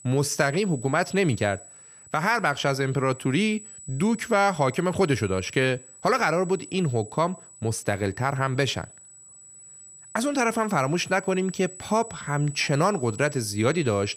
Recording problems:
high-pitched whine; noticeable; throughout; 8 kHz, 15 dB below the speech

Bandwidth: 15 kHz